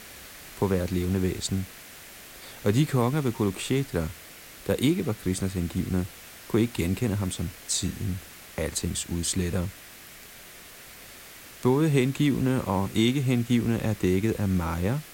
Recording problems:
hiss; noticeable; throughout; 15 dB below the speech

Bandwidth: 16.5 kHz